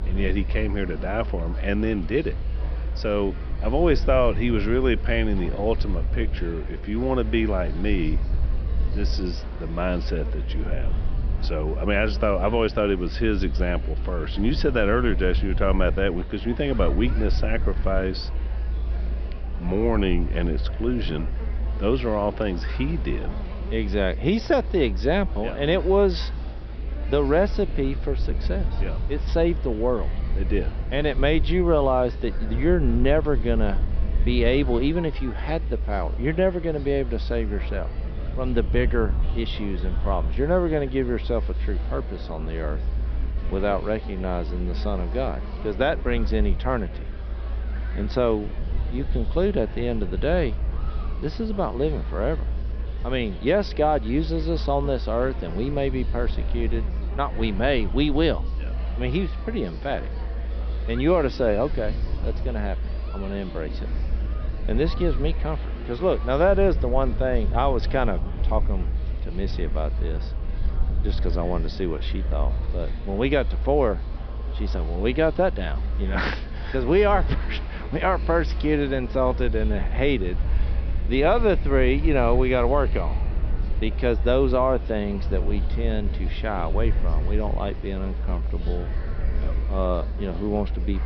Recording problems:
high frequencies cut off; noticeable; nothing above 5.5 kHz
murmuring crowd; noticeable; throughout; 15 dB below the speech
electrical hum; faint; throughout; 60 Hz, 25 dB below the speech
low rumble; faint; throughout; 20 dB below the speech

